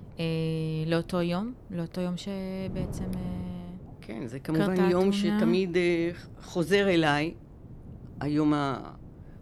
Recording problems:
wind noise on the microphone; occasional gusts; 25 dB below the speech

